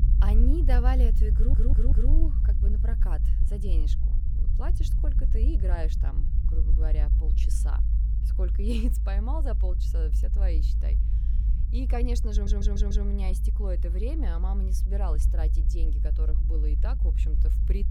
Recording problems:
low rumble; loud; throughout; 7 dB below the speech
audio stuttering; at 1.5 s and at 12 s

